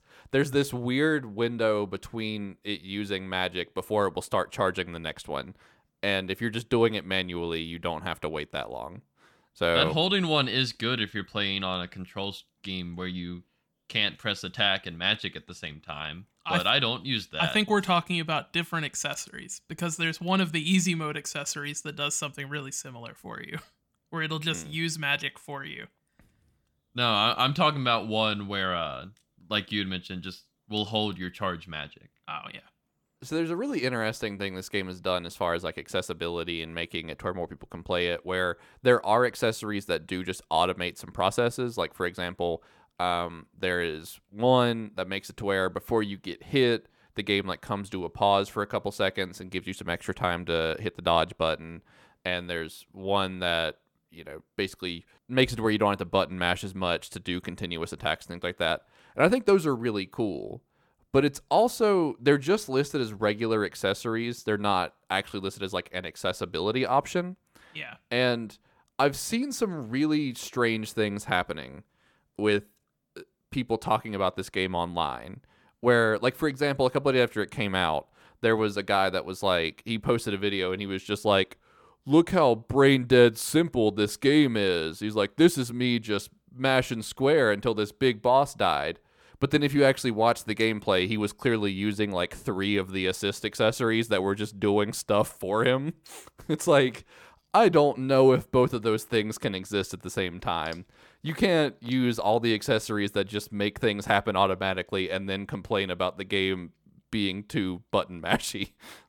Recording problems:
none

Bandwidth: 18 kHz